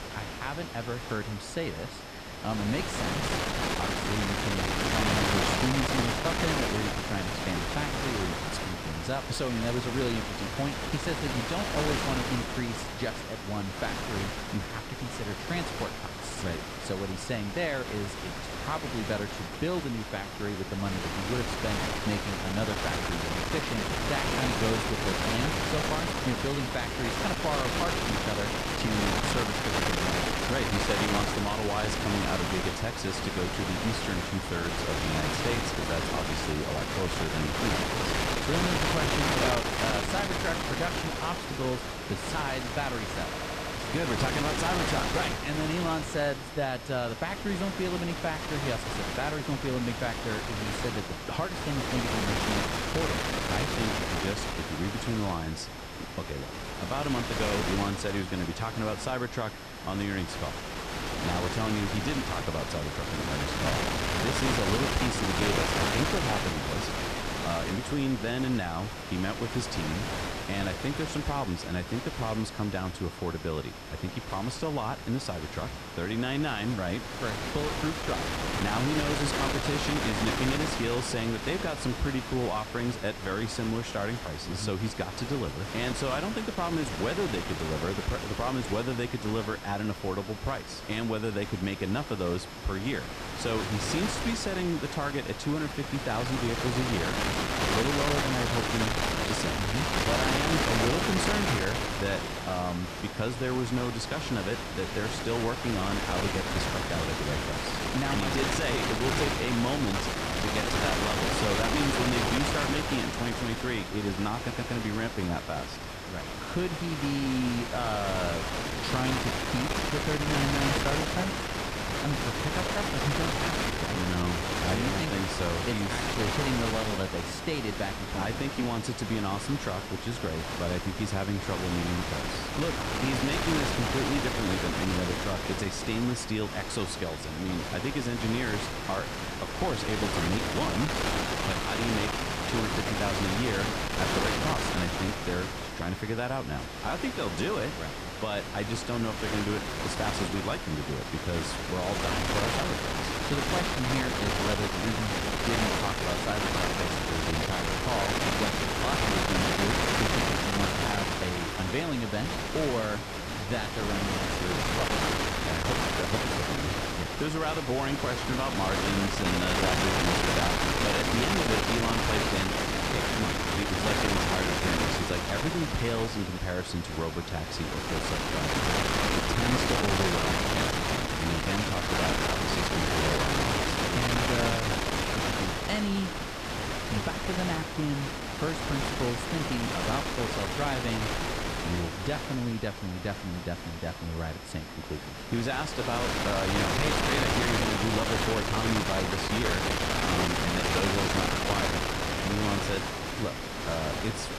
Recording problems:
wind noise on the microphone; heavy; 4 dB above the speech
high-pitched whine; noticeable; throughout; 5 kHz, 20 dB below the speech
audio stuttering; at 43 s and at 1:54

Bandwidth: 15 kHz